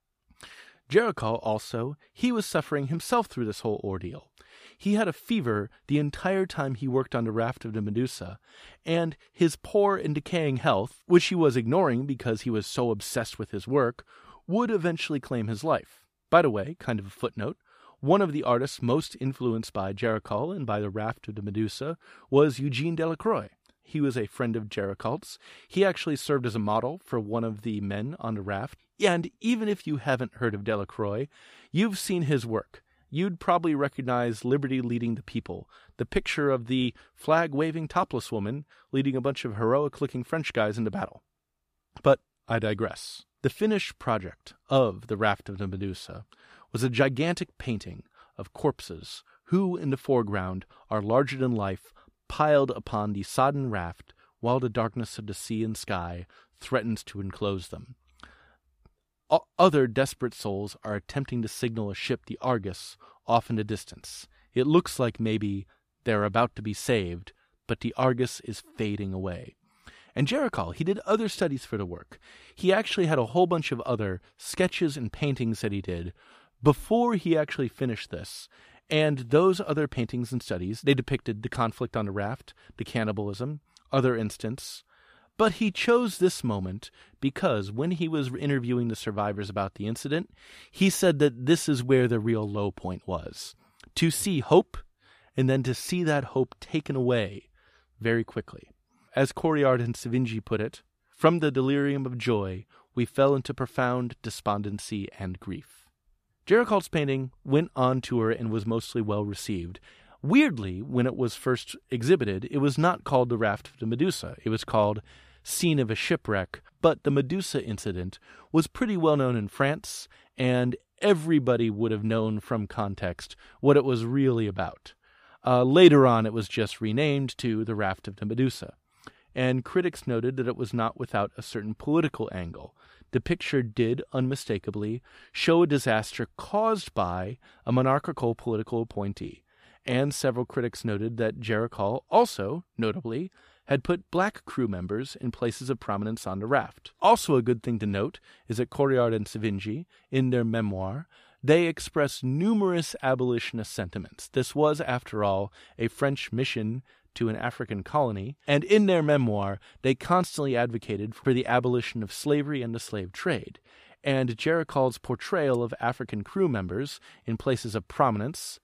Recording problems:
none

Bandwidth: 14.5 kHz